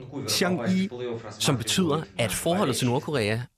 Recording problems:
voice in the background; loud; throughout; 10 dB below the speech

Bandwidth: 14.5 kHz